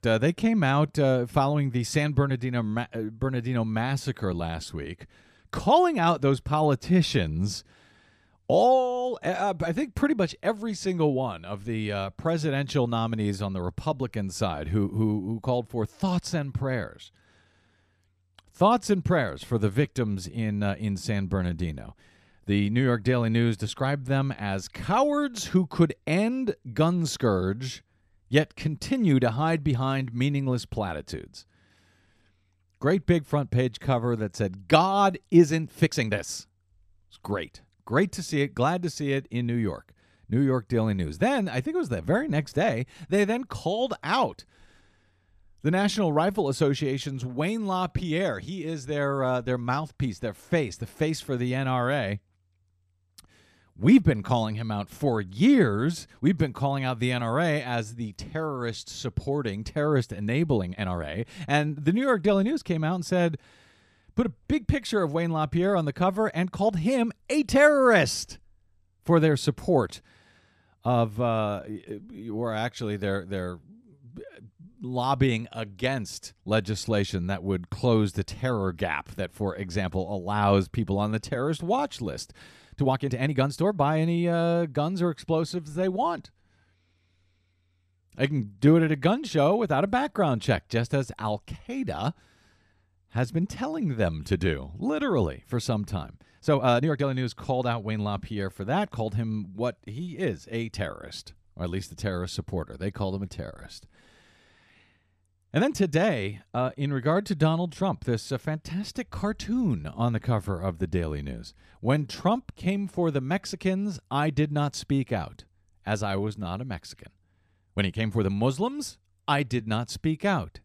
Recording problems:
uneven, jittery; strongly; from 26 s to 1:58

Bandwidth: 14 kHz